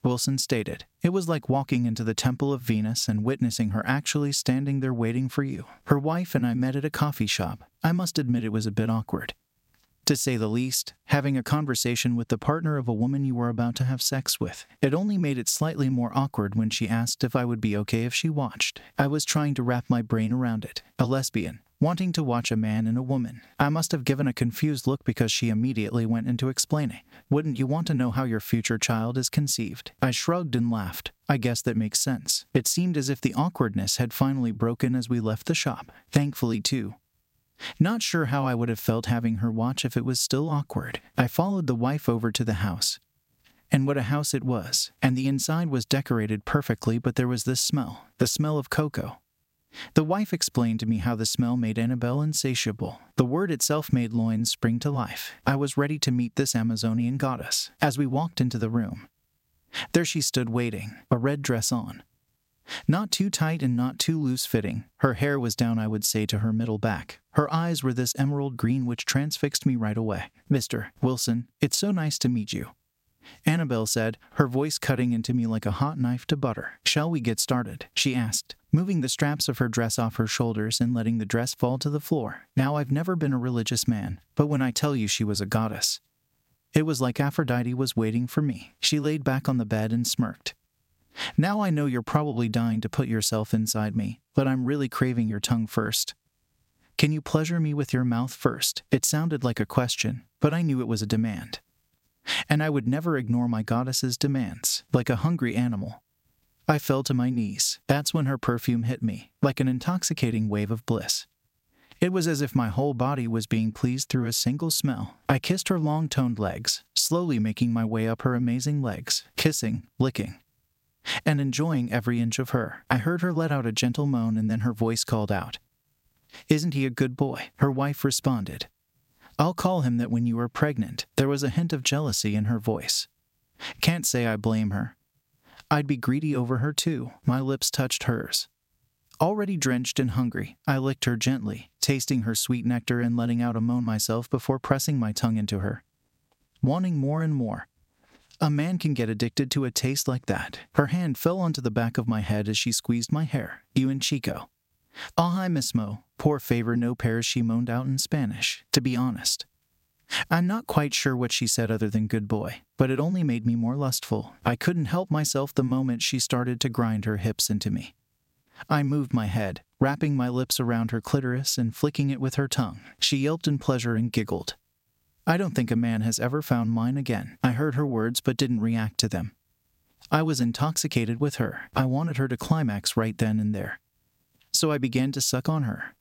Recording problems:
squashed, flat; somewhat

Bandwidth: 16 kHz